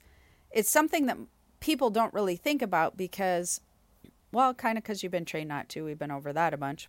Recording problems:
none

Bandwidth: 16 kHz